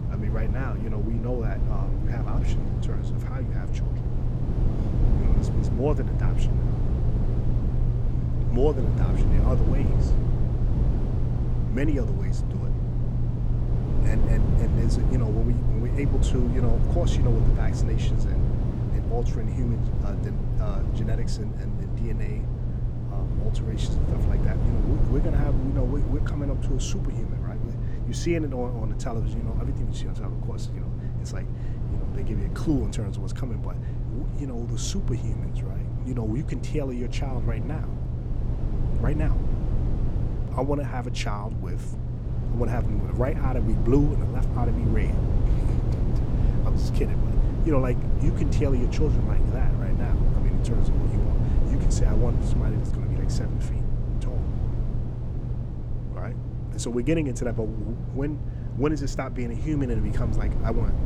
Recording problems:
low rumble; loud; throughout; 3 dB below the speech

